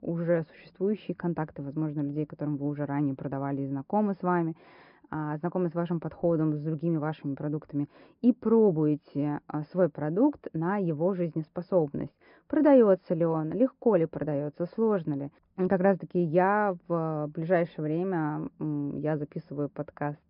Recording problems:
high frequencies cut off; noticeable; nothing above 5.5 kHz
muffled; very slightly; fading above 2.5 kHz

